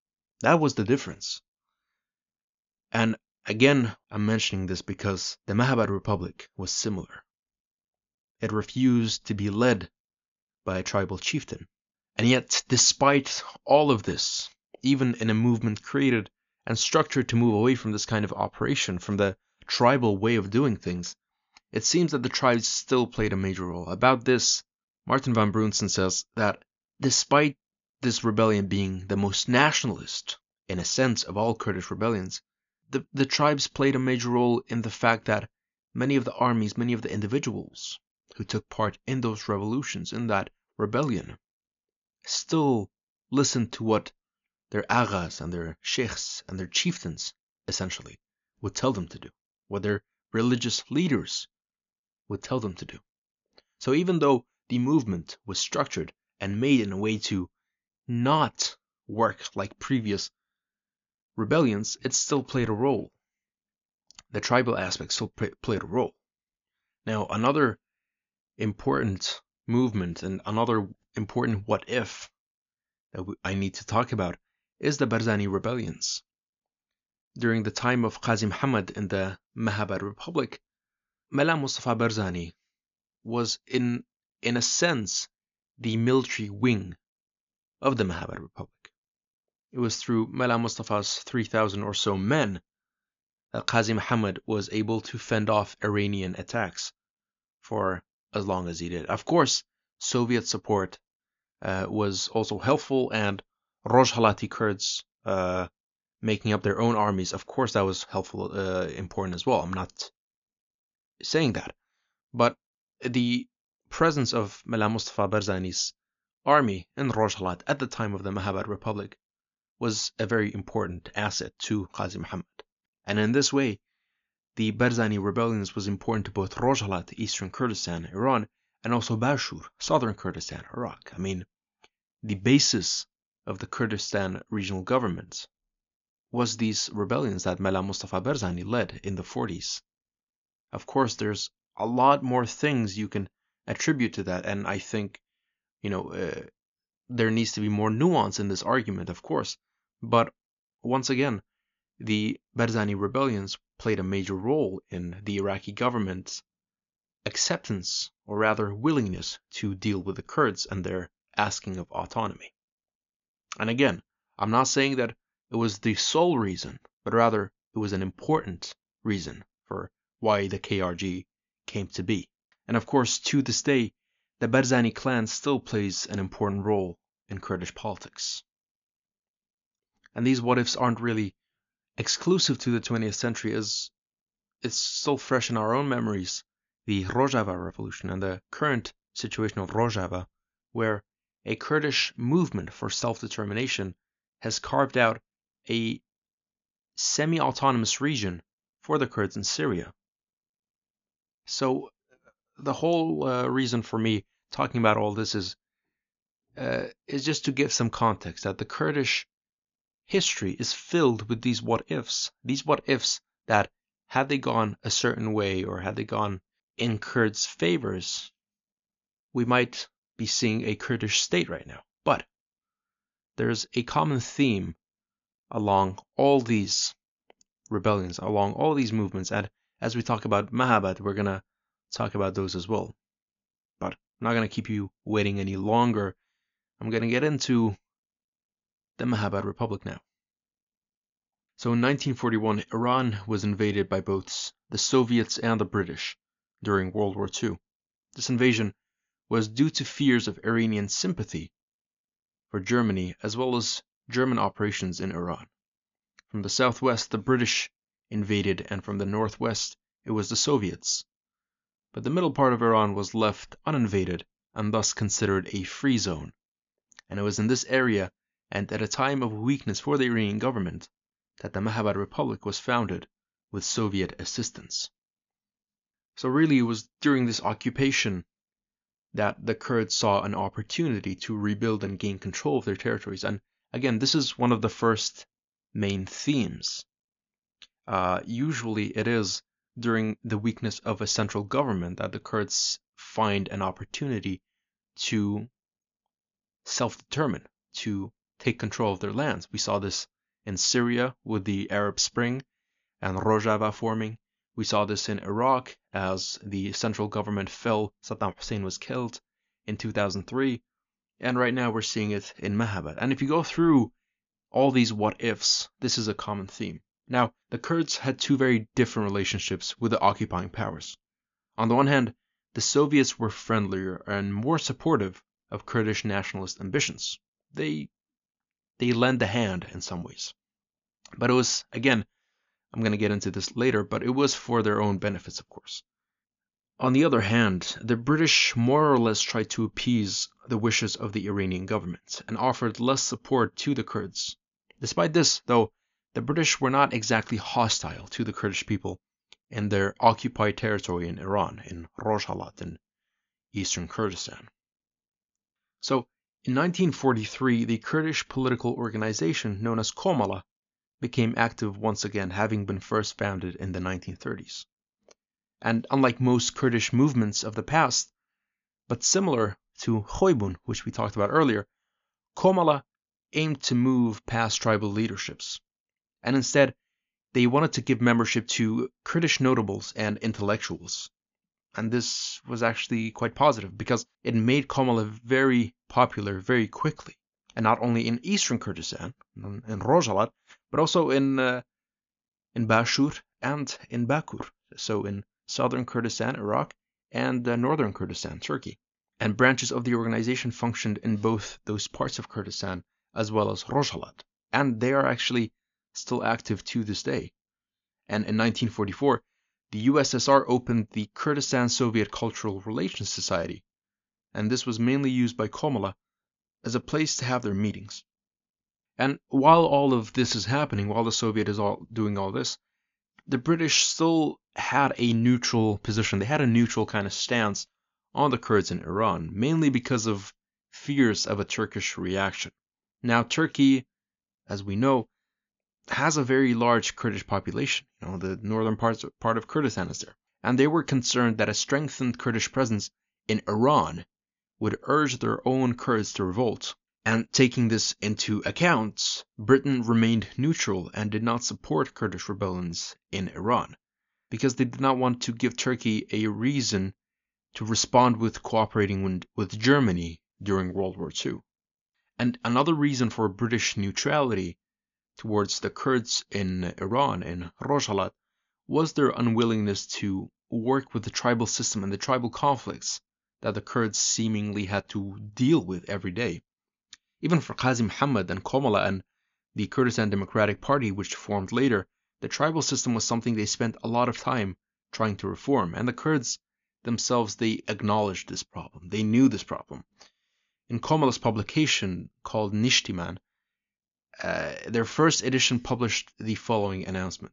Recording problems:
high frequencies cut off; noticeable; nothing above 7 kHz

